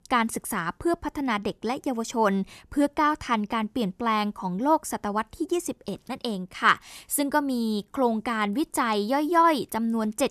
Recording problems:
none

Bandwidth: 14 kHz